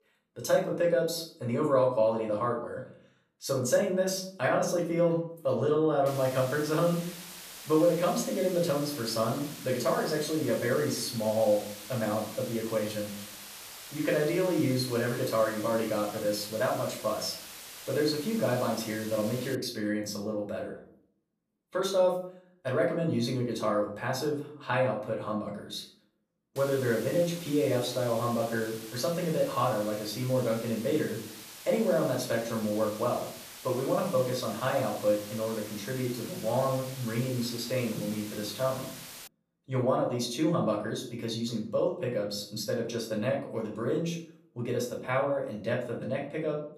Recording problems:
off-mic speech; far
room echo; slight; dies away in 0.5 s
hiss; noticeable; from 6 to 20 s and from 27 to 39 s; 15 dB below the speech

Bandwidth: 14.5 kHz